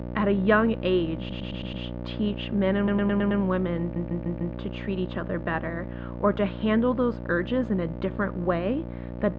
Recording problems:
muffled; very; fading above 2.5 kHz
electrical hum; noticeable; throughout; 60 Hz, 15 dB below the speech
audio stuttering; at 1 s, at 3 s and at 4 s

